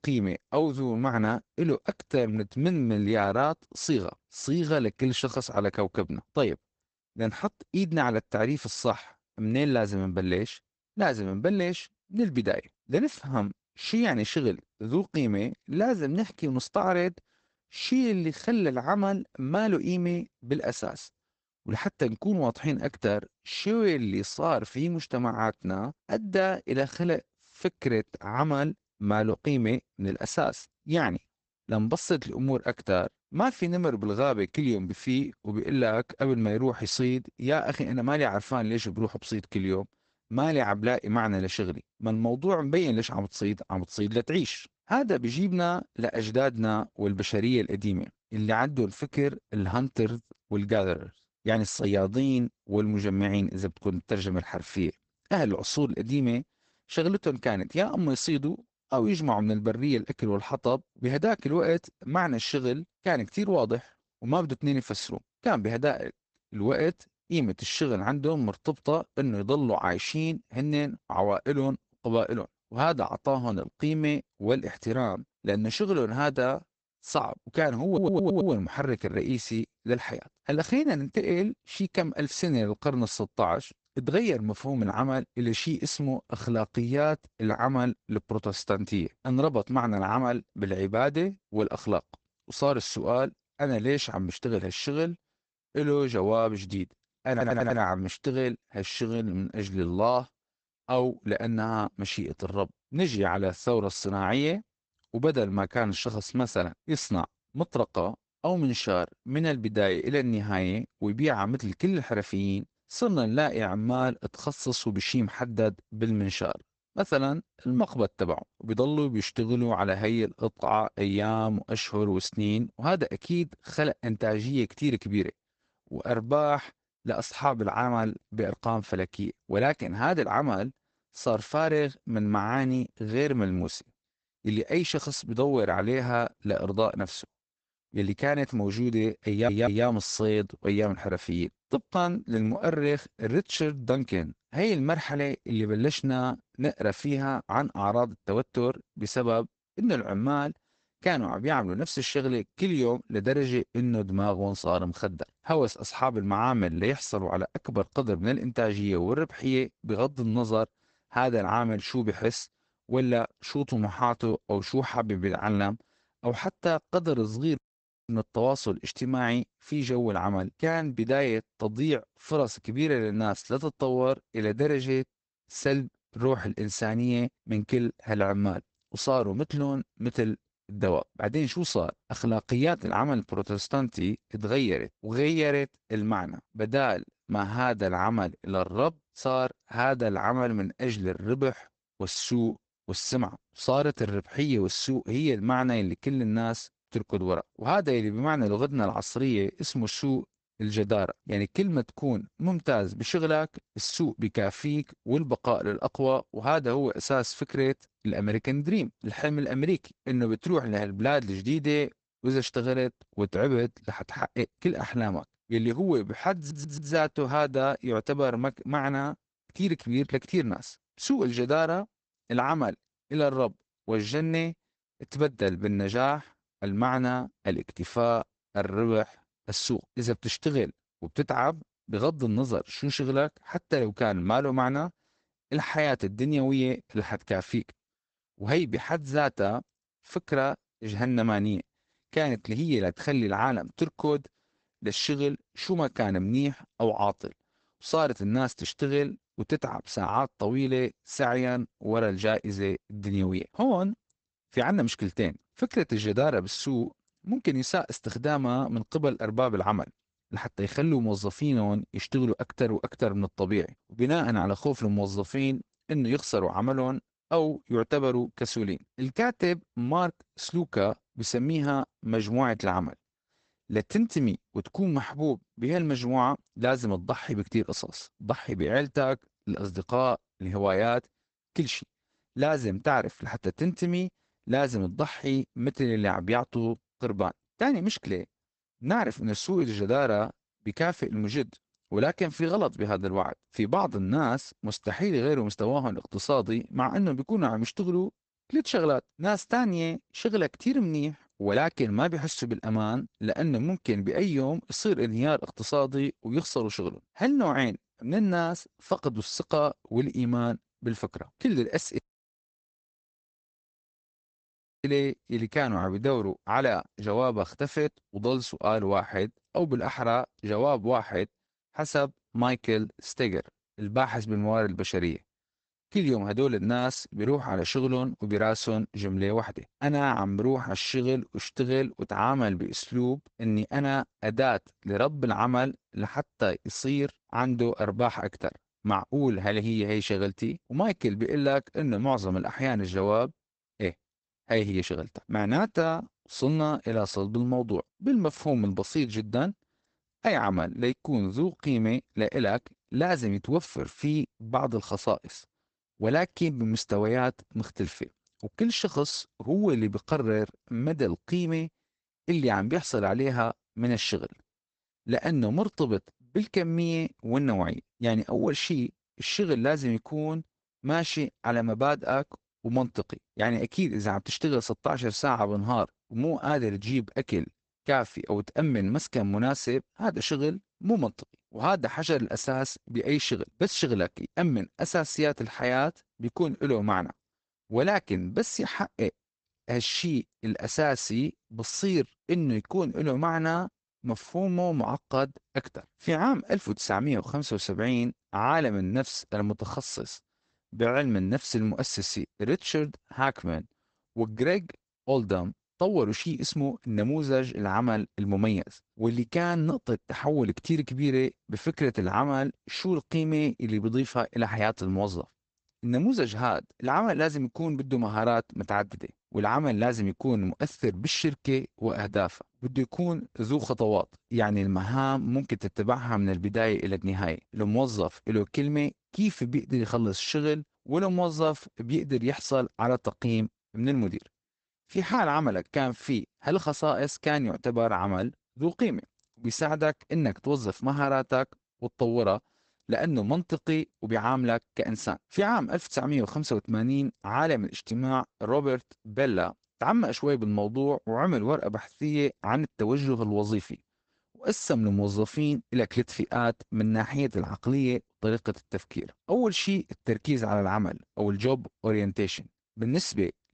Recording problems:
garbled, watery; badly; nothing above 8 kHz
audio stuttering; 4 times, first at 1:18
audio cutting out; at 2:48 for 0.5 s and at 5:12 for 3 s

